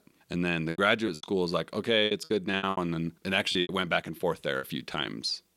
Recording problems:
choppy; very; at 0.5 s, from 2 to 3.5 s and at 4.5 s; 18% of the speech affected

